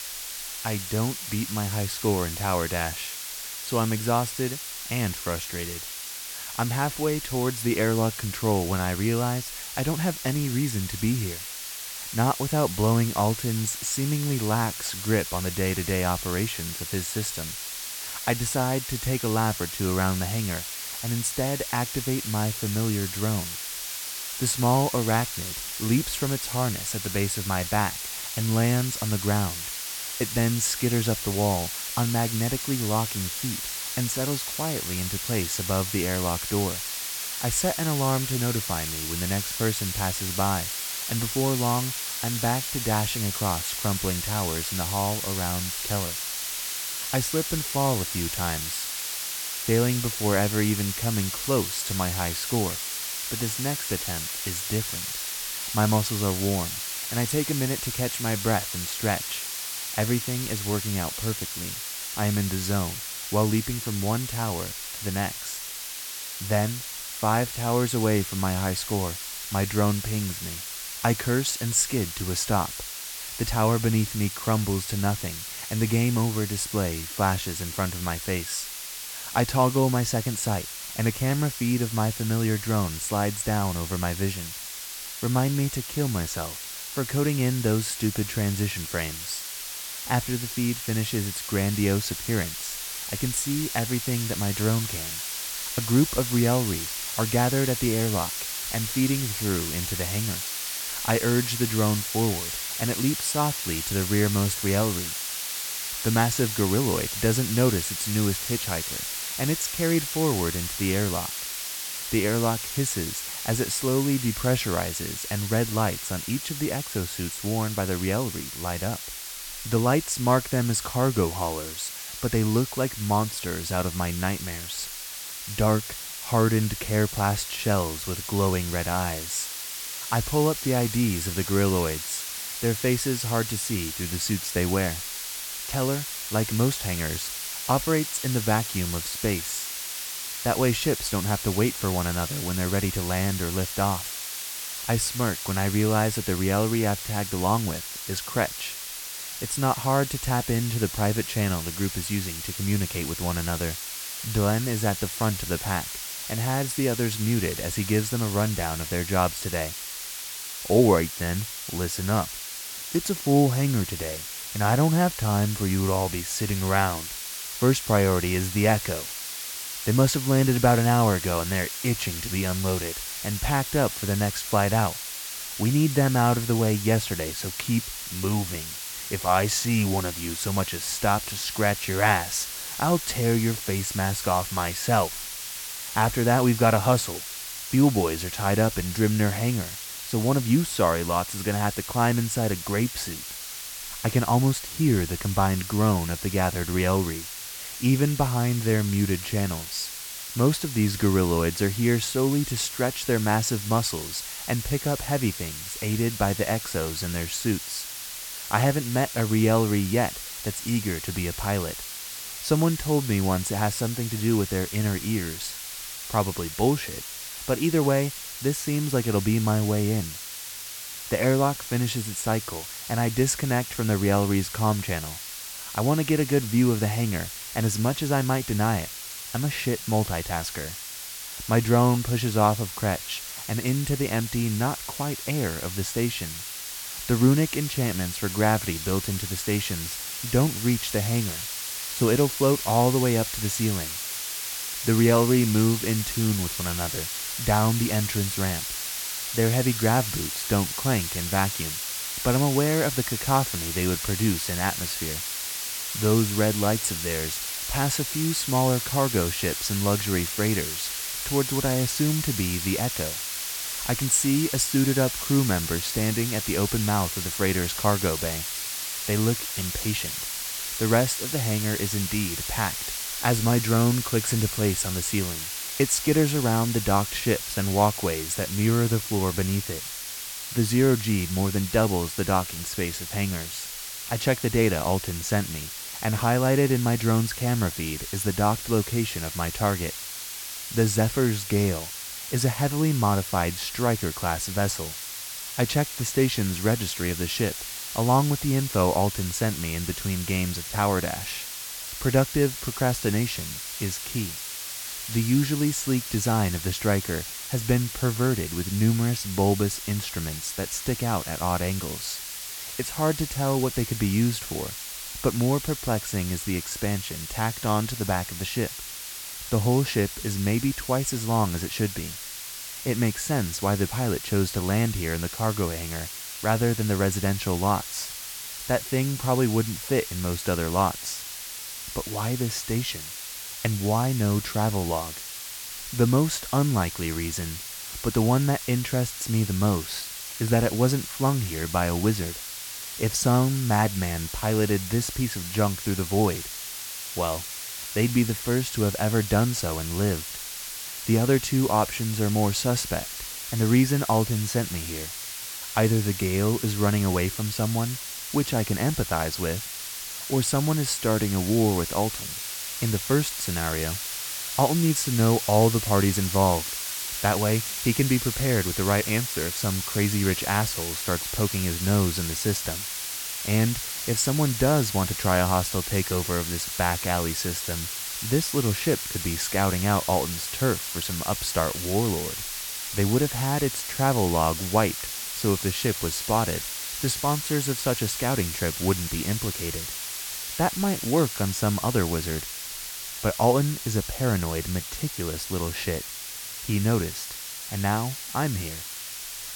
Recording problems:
hiss; loud; throughout; 5 dB below the speech

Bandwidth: 17 kHz